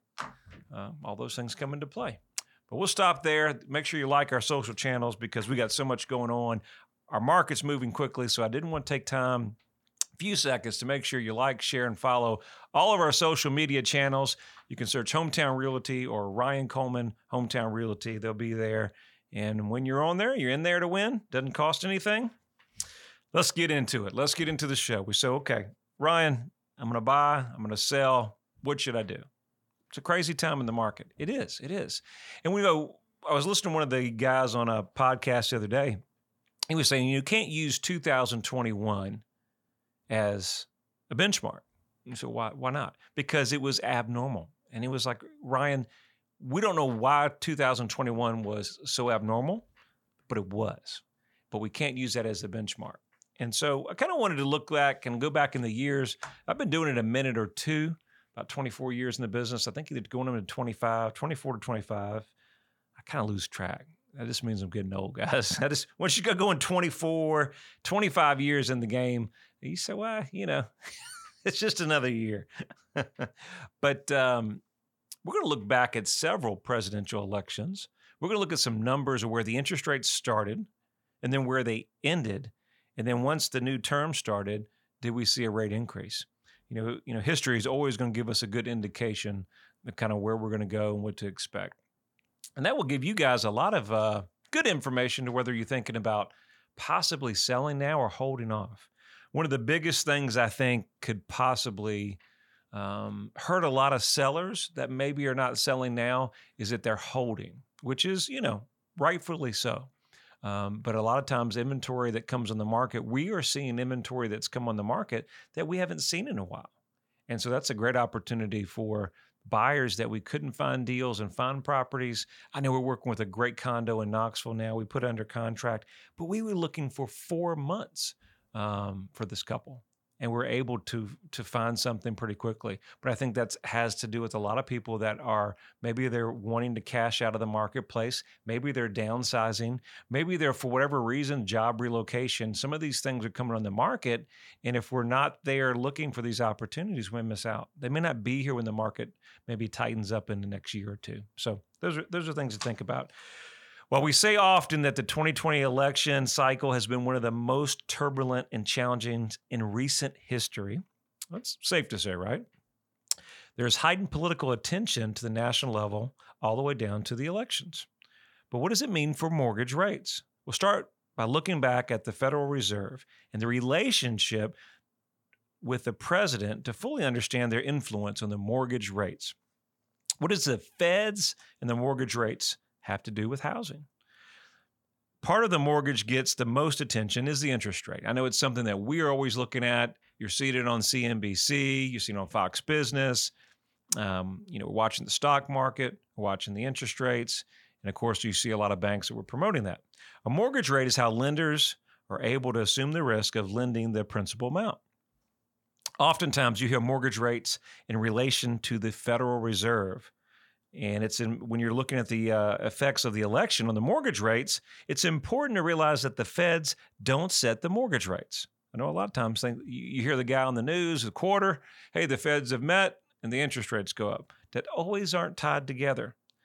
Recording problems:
none

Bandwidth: 17.5 kHz